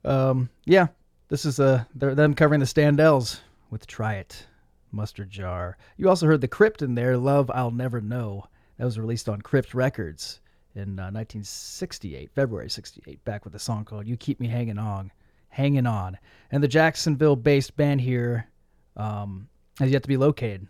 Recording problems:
none

